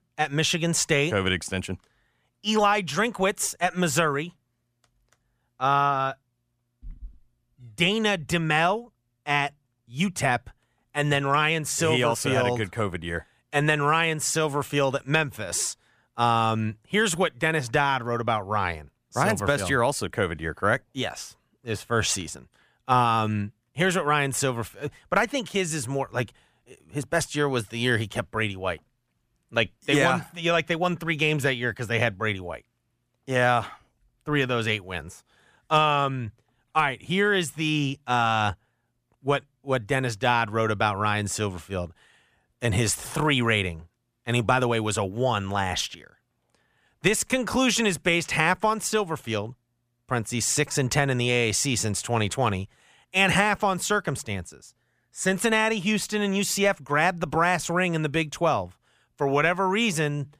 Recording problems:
none

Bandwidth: 15 kHz